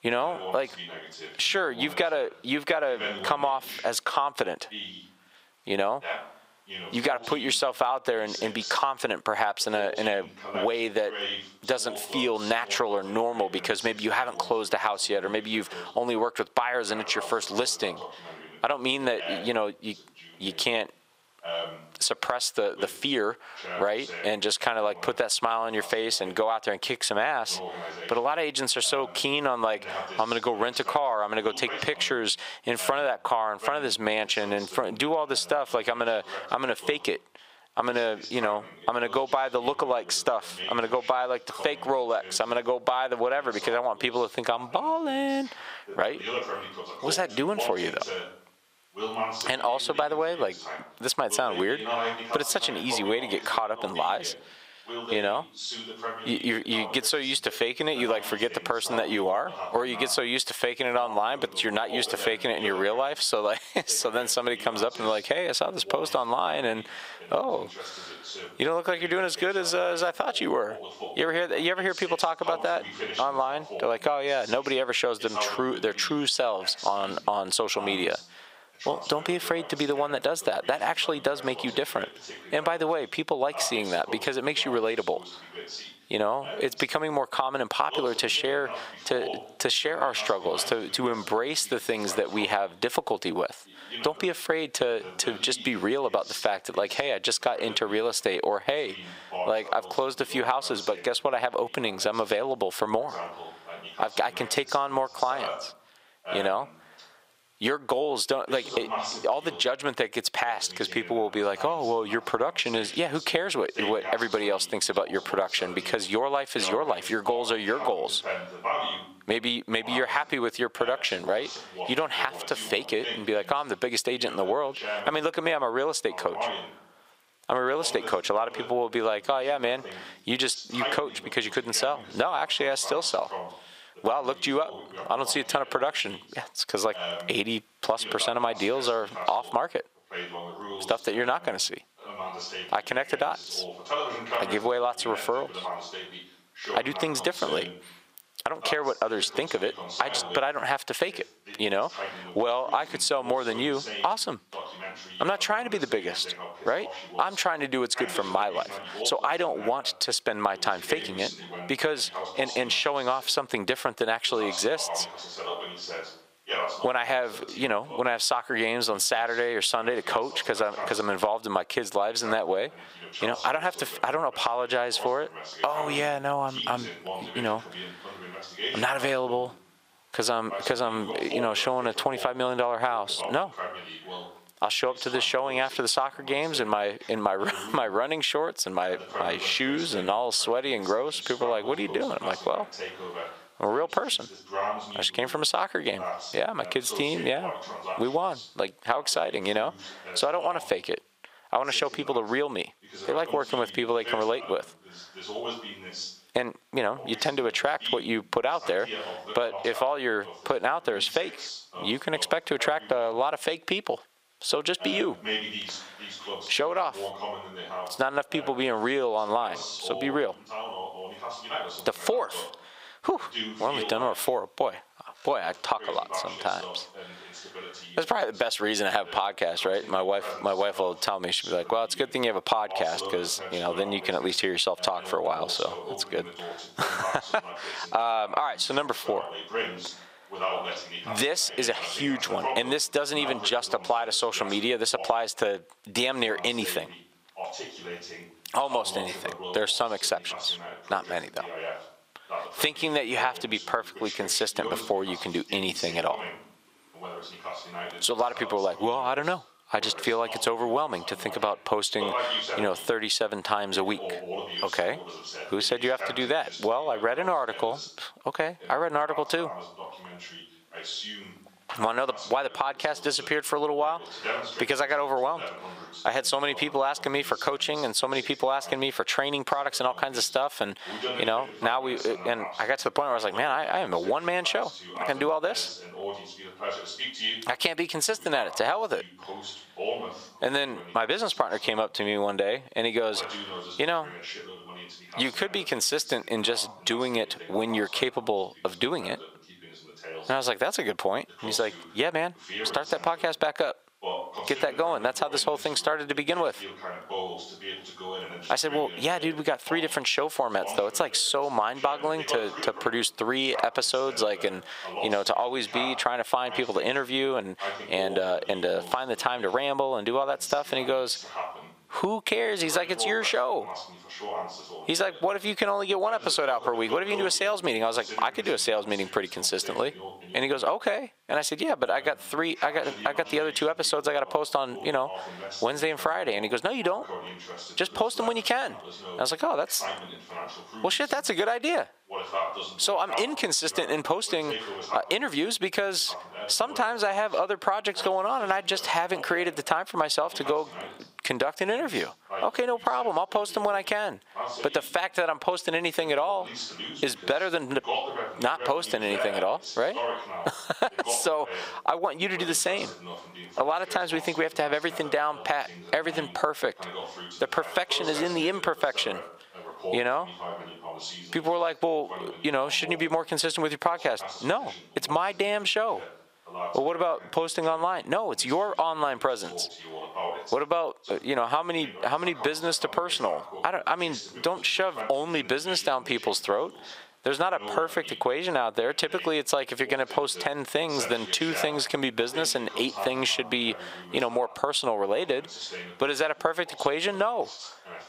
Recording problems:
squashed, flat; heavily, background pumping
thin; somewhat; fading below 700 Hz
voice in the background; noticeable; throughout; 10 dB below the speech

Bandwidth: 15.5 kHz